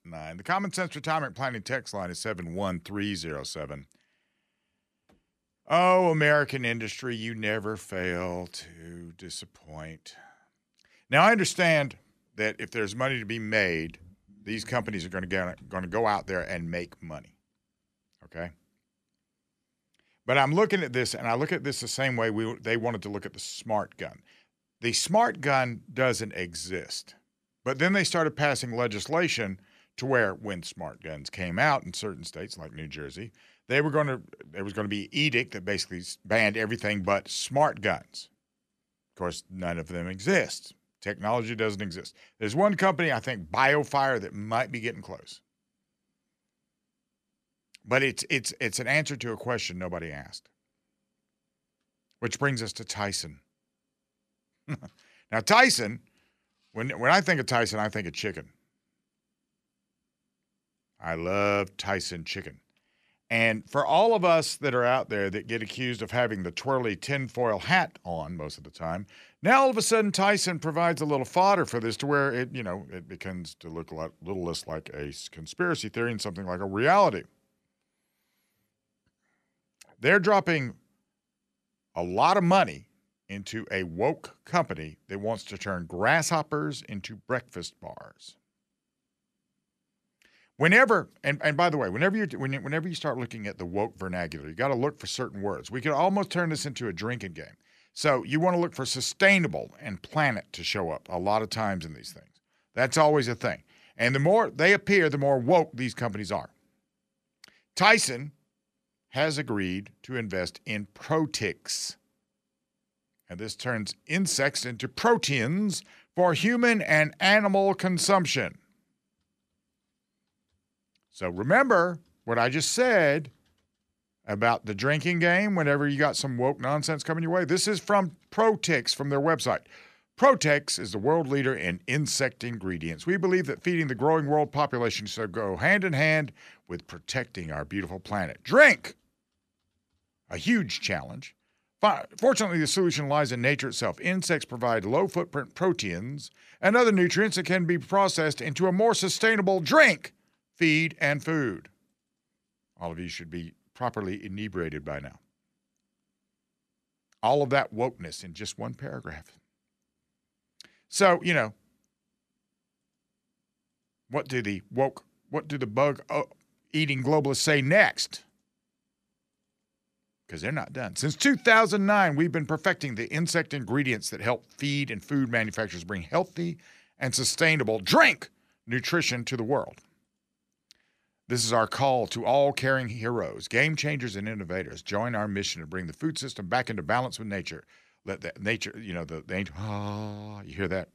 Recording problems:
none

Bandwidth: 14 kHz